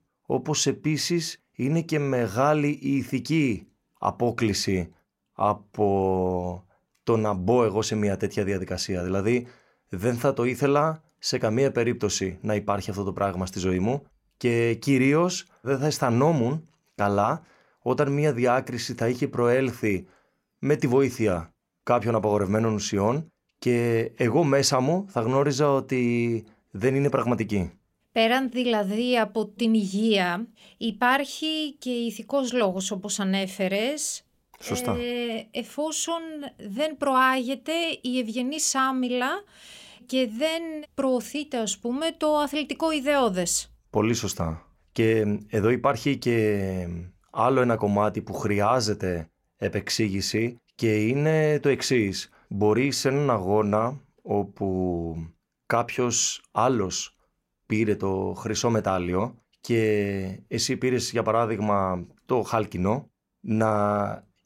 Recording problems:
none

